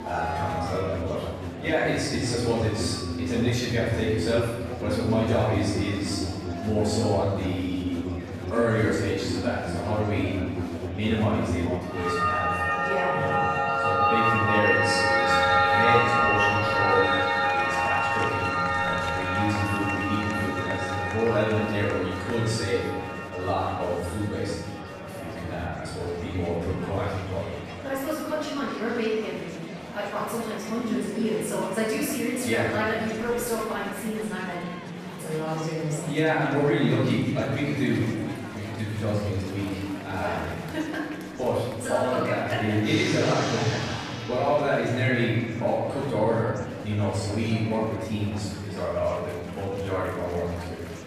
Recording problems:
room echo; strong; dies away in 1.4 s
off-mic speech; far
background music; very loud; throughout; 1 dB above the speech
murmuring crowd; noticeable; throughout; 10 dB below the speech

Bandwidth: 14.5 kHz